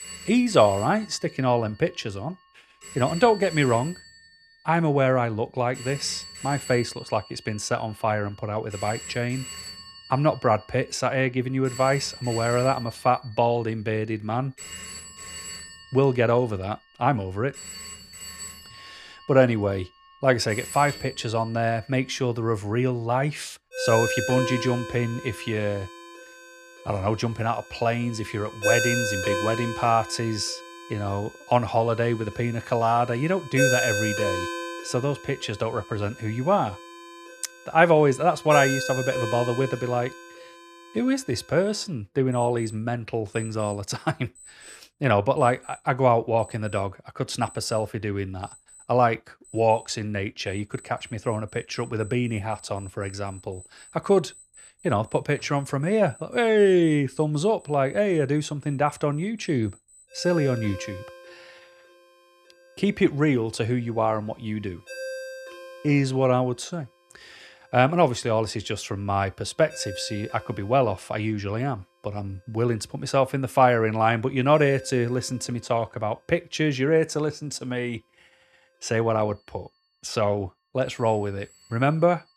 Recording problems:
alarms or sirens; loud; throughout; 9 dB below the speech

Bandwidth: 14 kHz